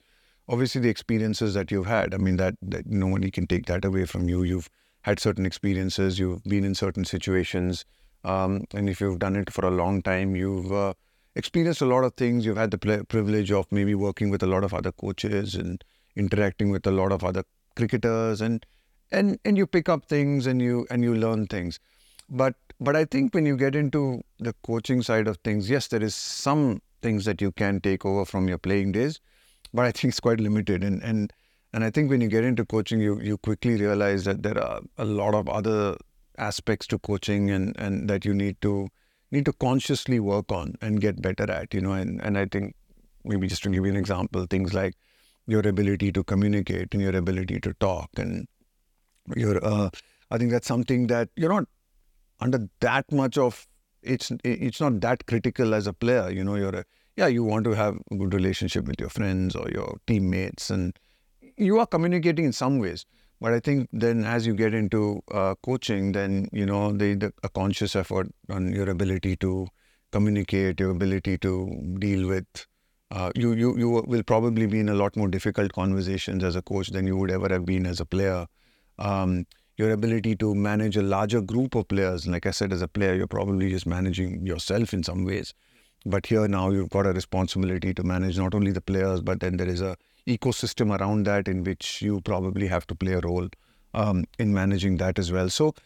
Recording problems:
none

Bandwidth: 18.5 kHz